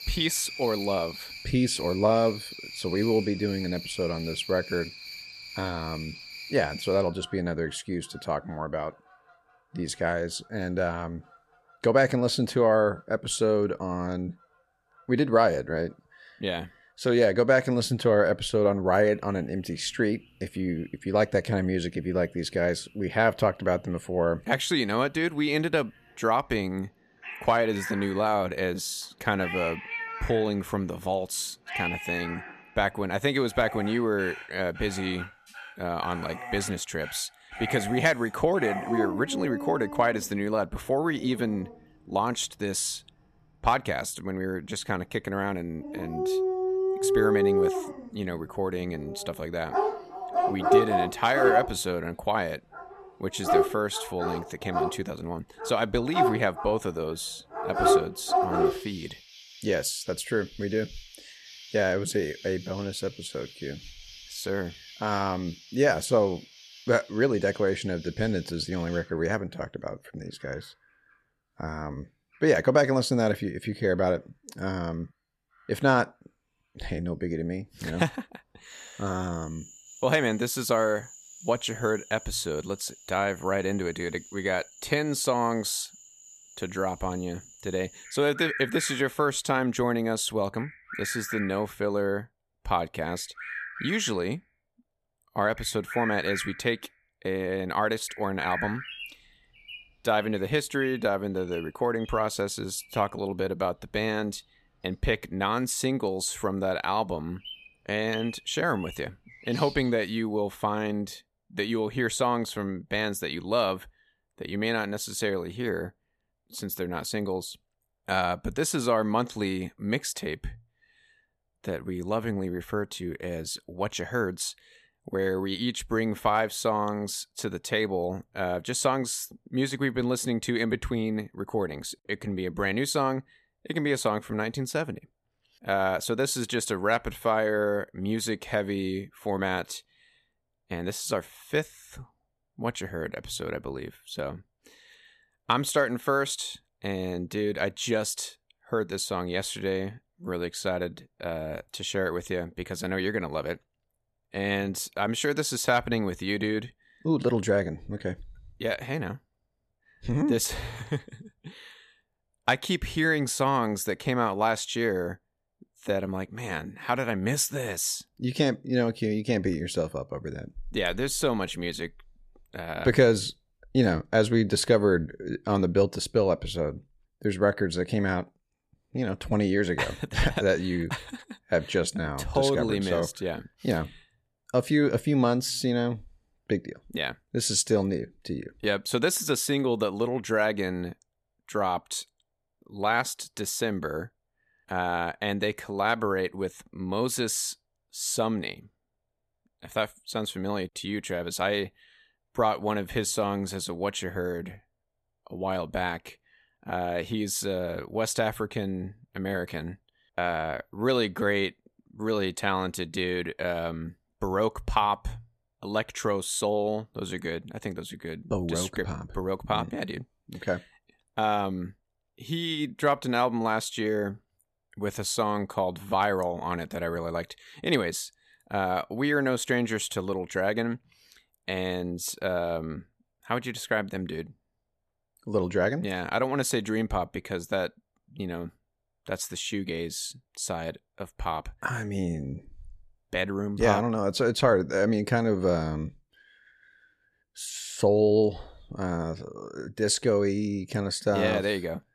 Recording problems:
animal sounds; loud; until 1:50; 4 dB below the speech

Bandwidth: 14 kHz